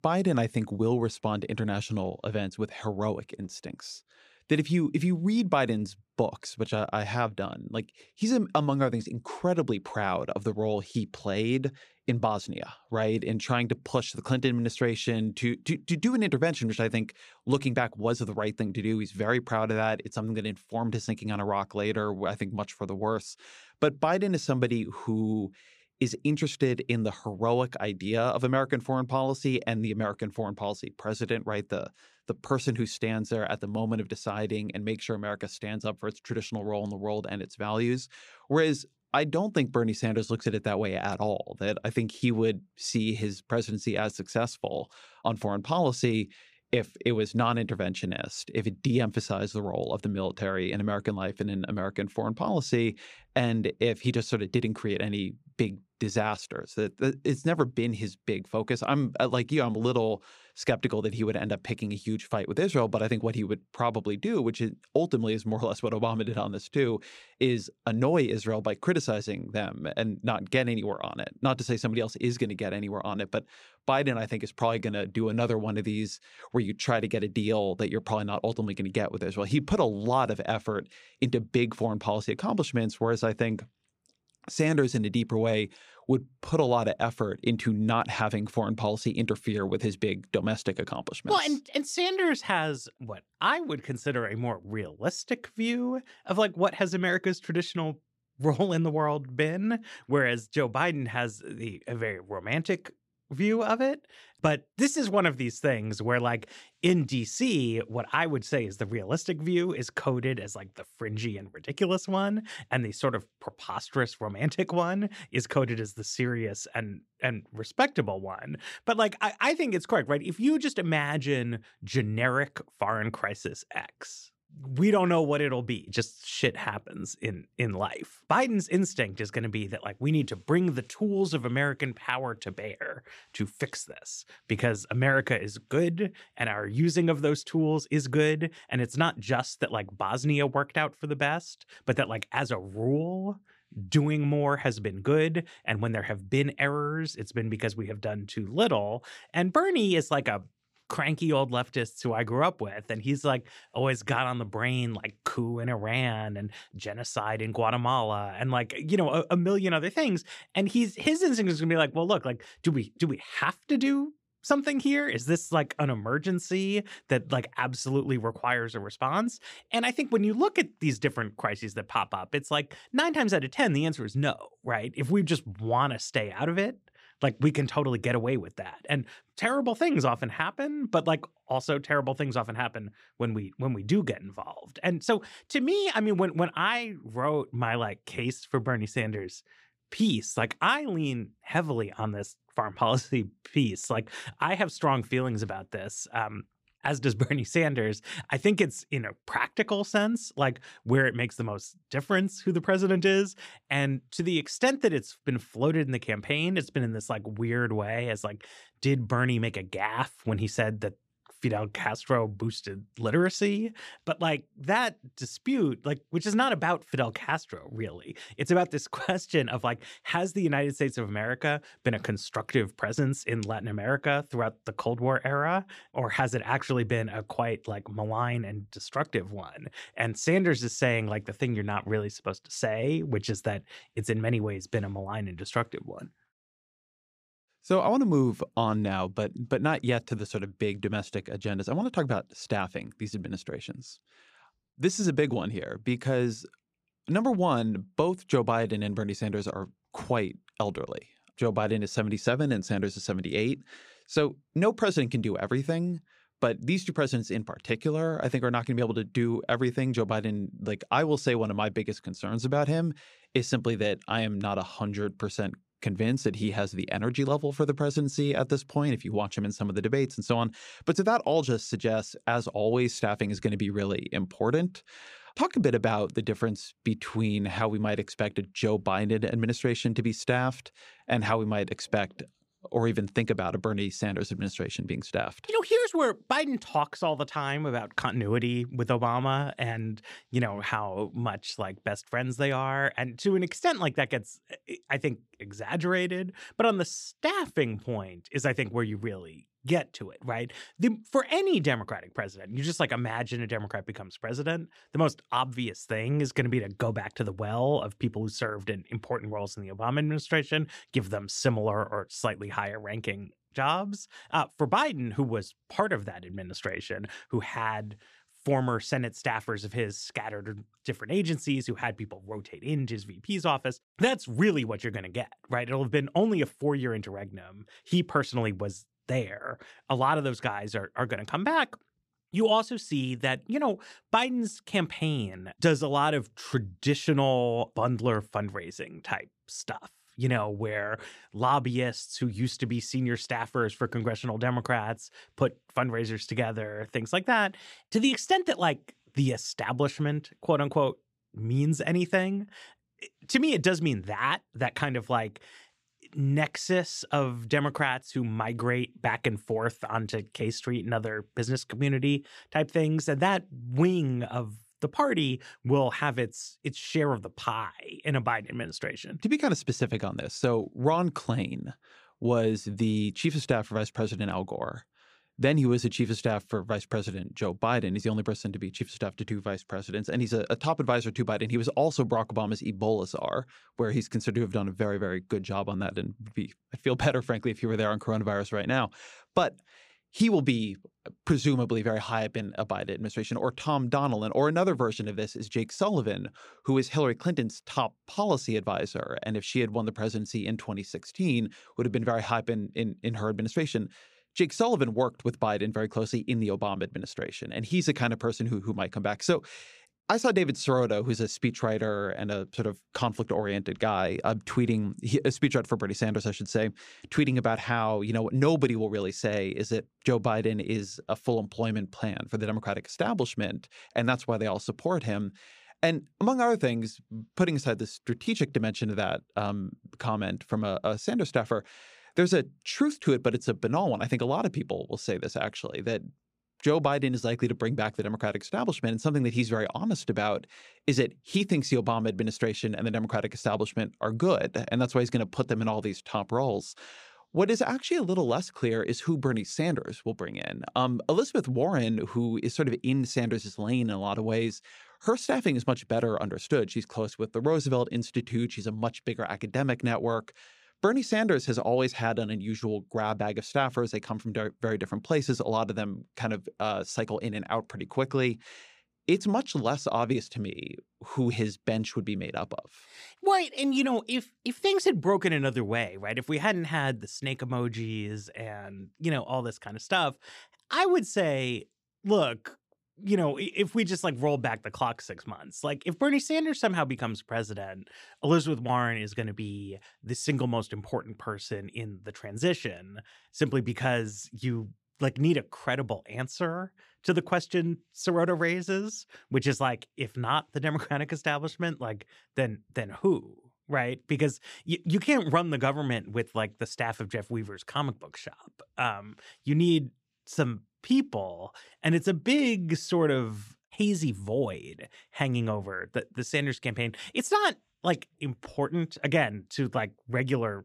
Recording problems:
none

